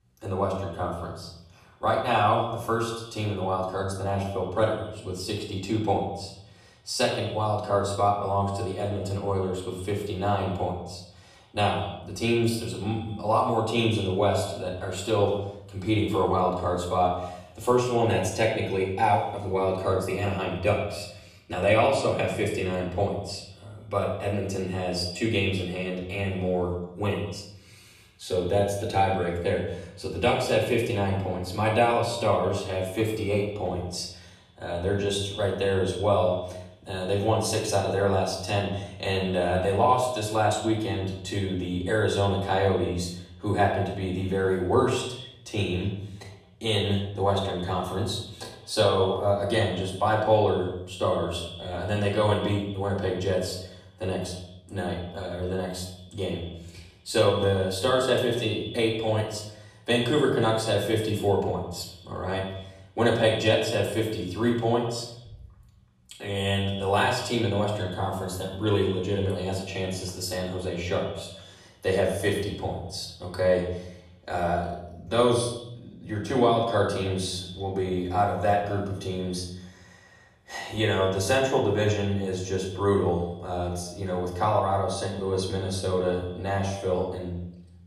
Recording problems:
off-mic speech; far
echo of what is said; noticeable; throughout; 110 ms later, 15 dB below the speech
room echo; noticeable; dies away in 0.7 s

